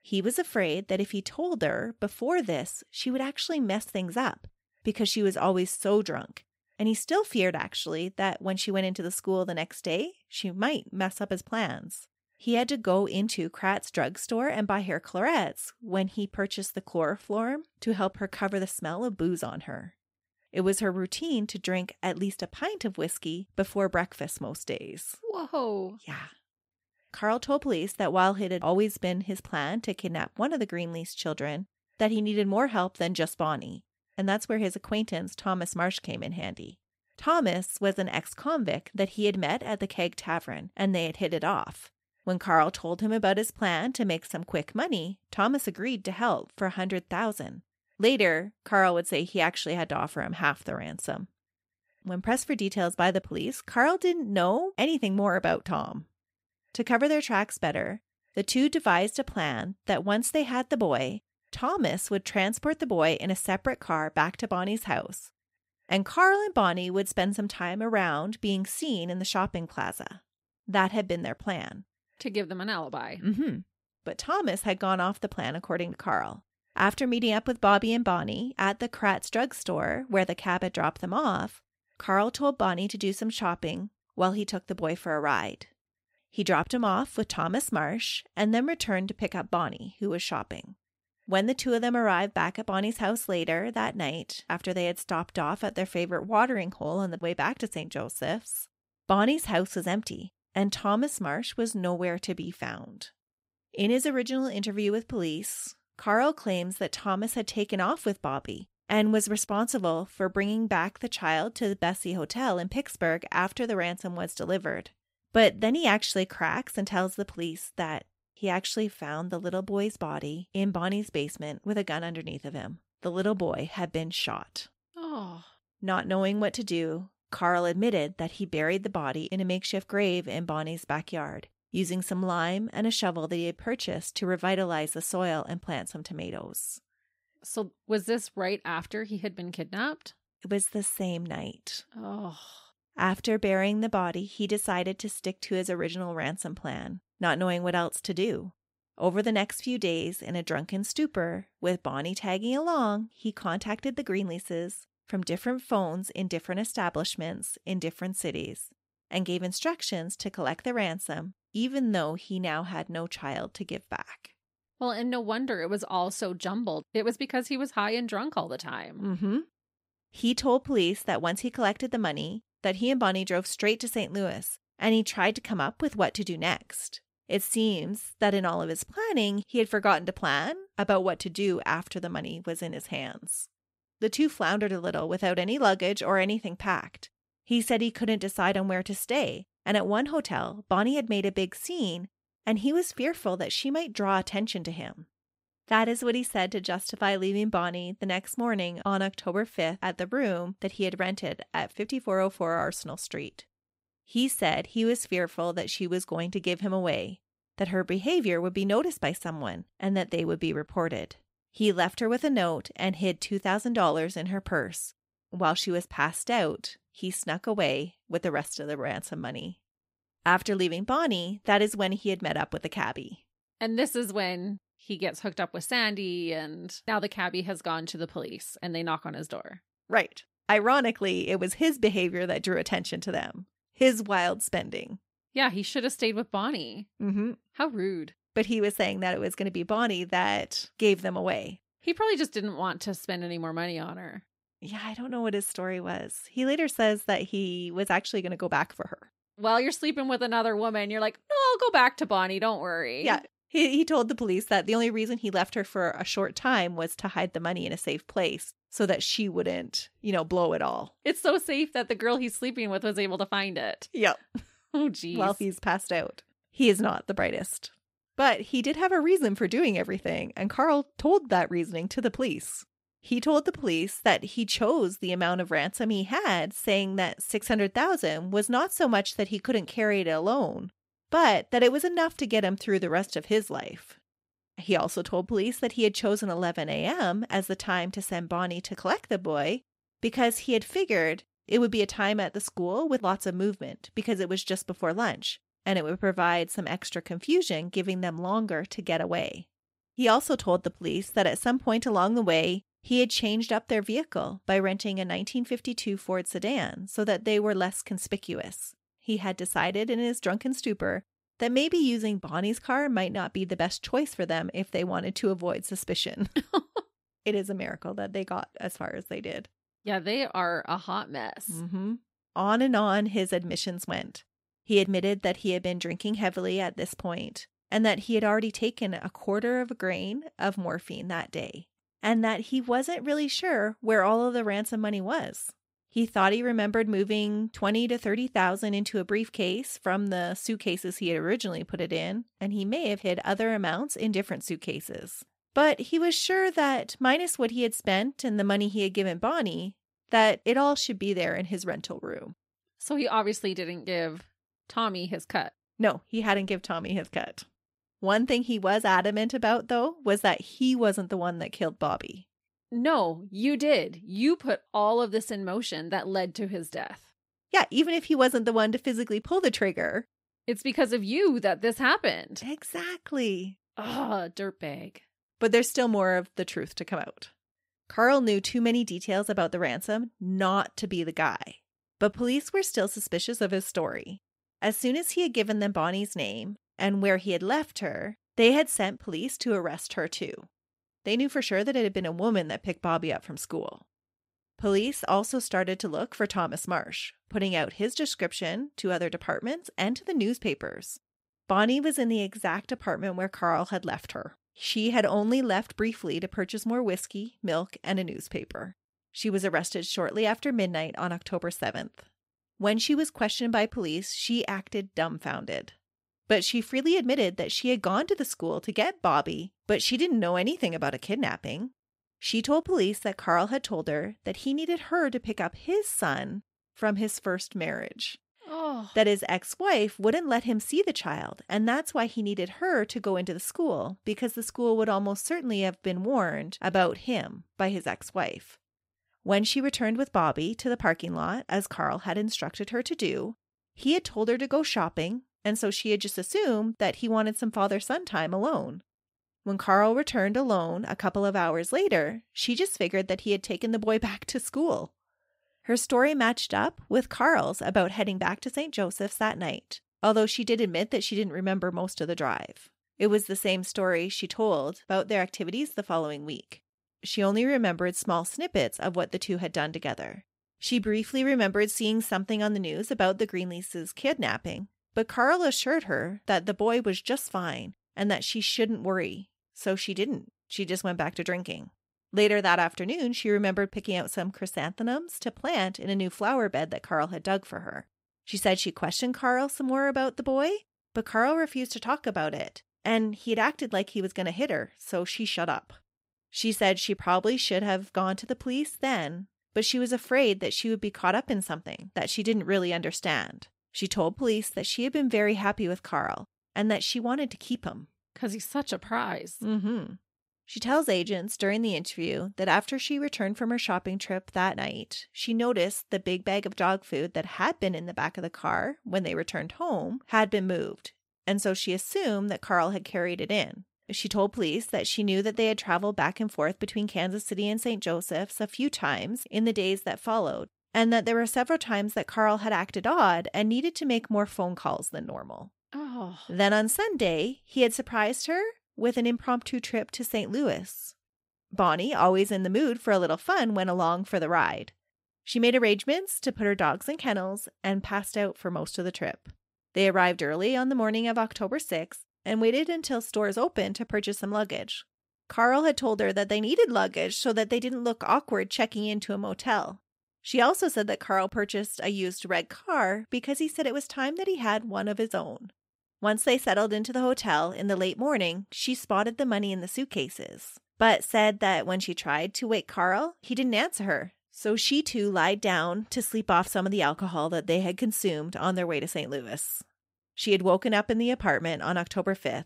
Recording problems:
none

